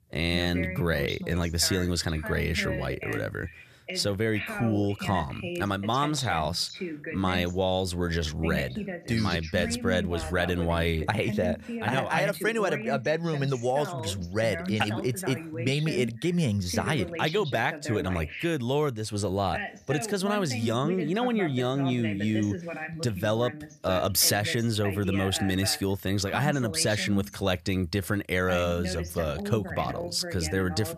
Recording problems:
voice in the background; loud; throughout; 9 dB below the speech

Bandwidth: 14.5 kHz